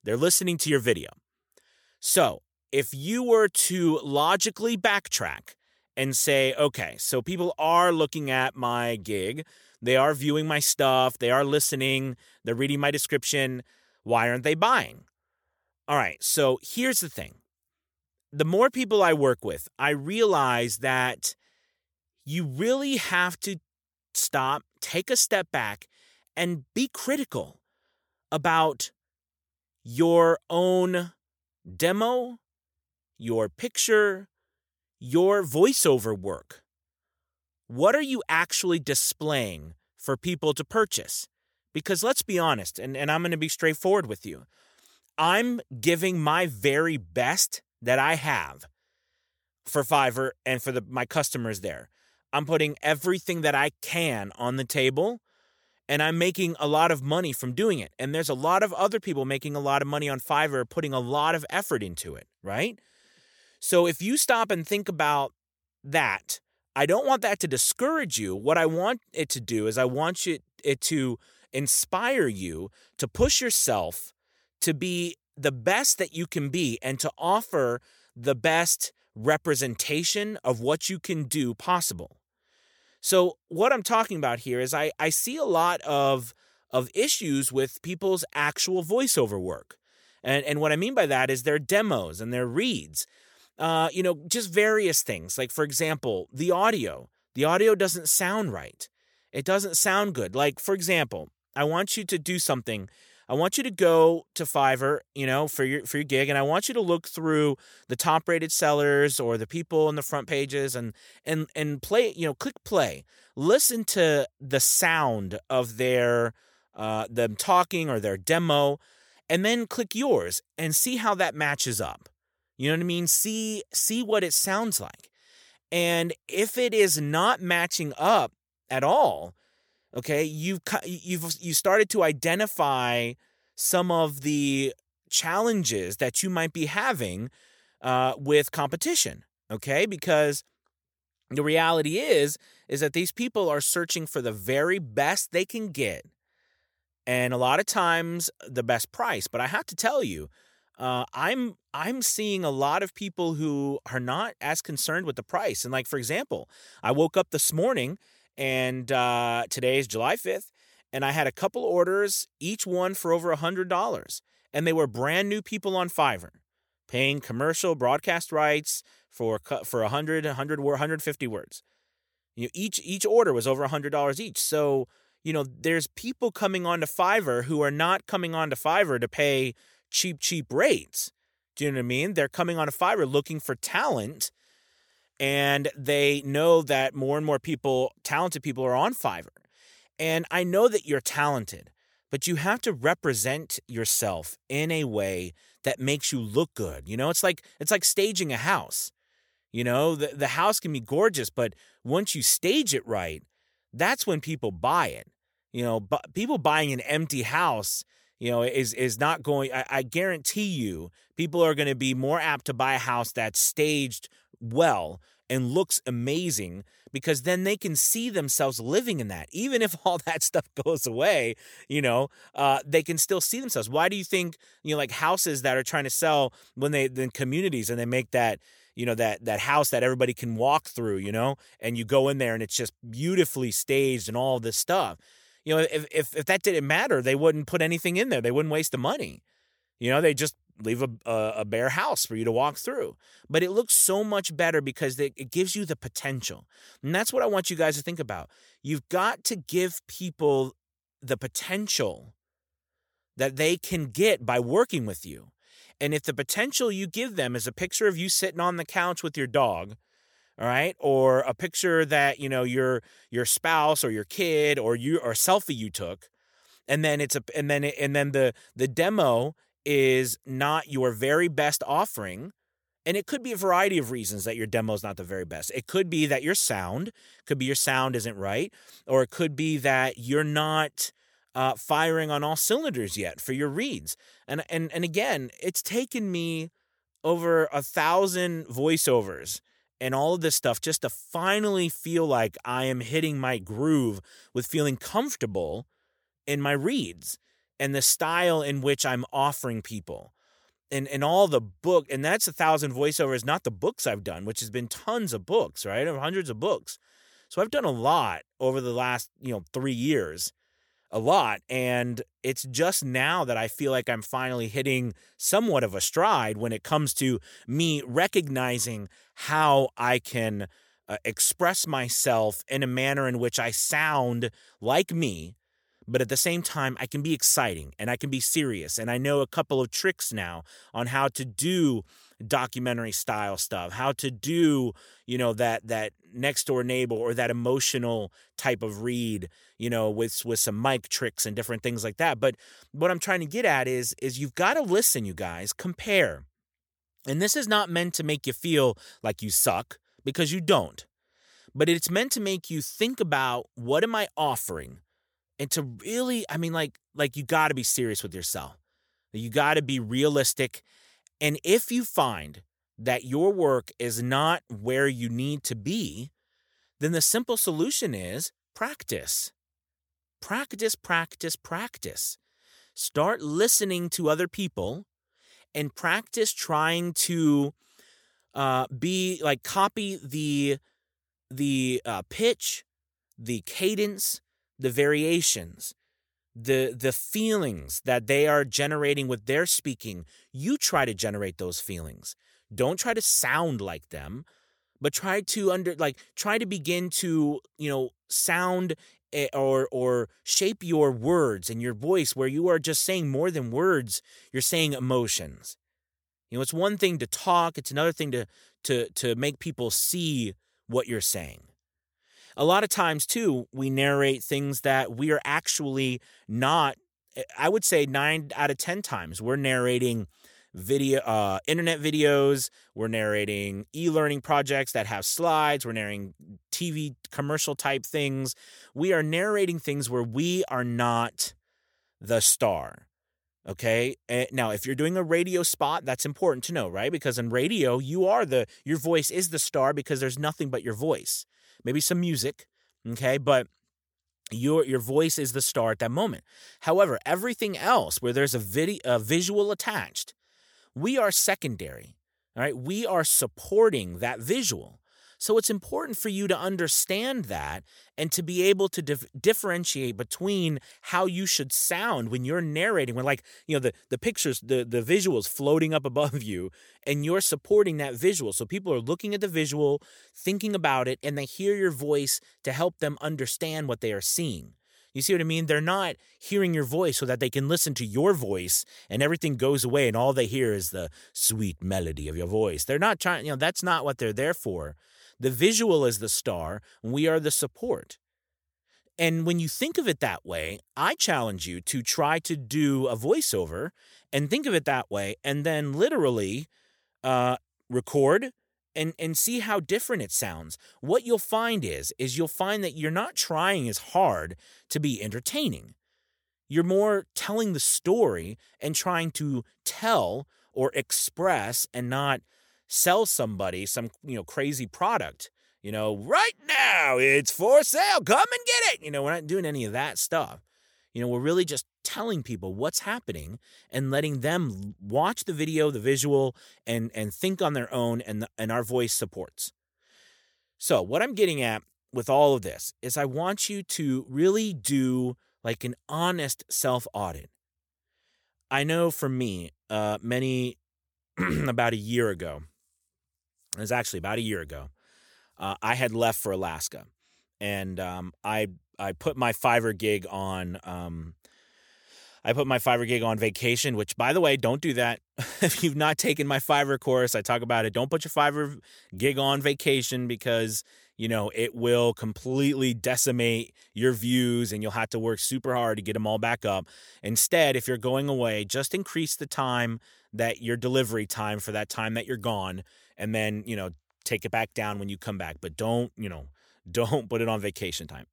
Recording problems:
none

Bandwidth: 18.5 kHz